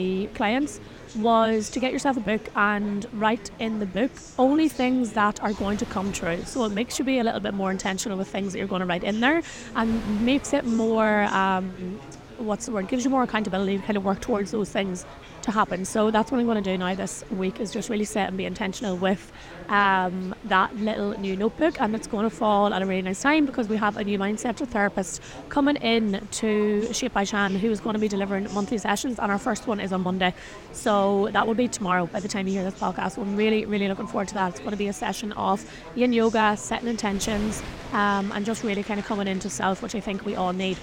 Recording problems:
chatter from many people; noticeable; throughout; 20 dB below the speech
wind noise on the microphone; occasional gusts; 25 dB below the speech
abrupt cut into speech; at the start

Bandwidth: 16.5 kHz